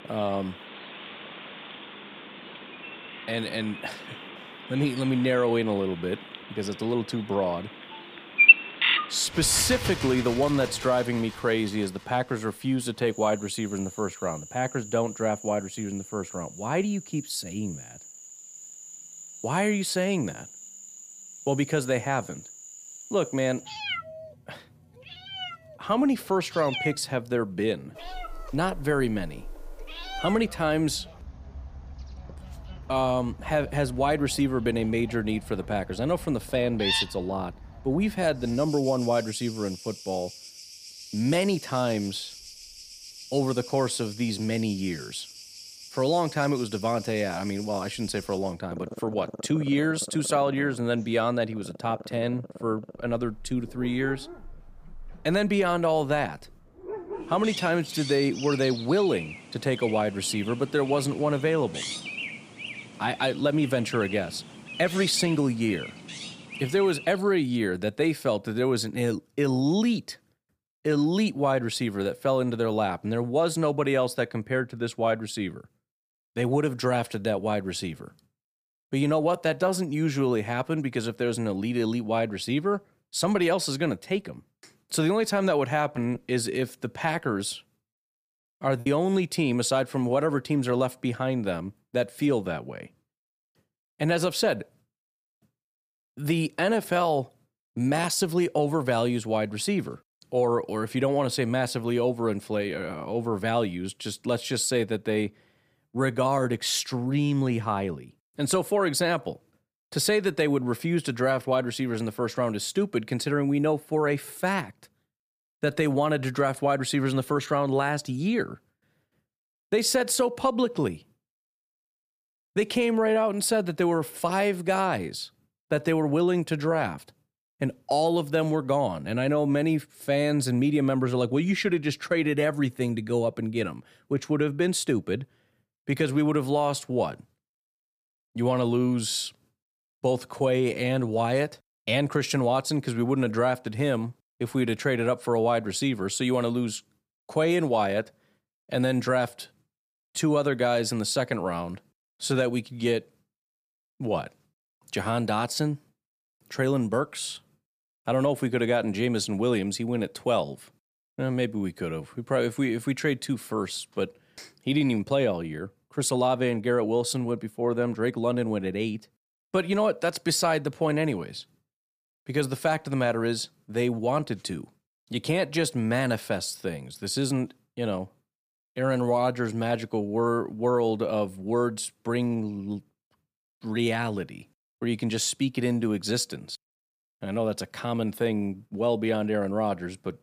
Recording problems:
animal sounds; loud; until 1:07; 6 dB below the speech
choppy; occasionally; from 1:26 to 1:29; 3% of the speech affected

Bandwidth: 15 kHz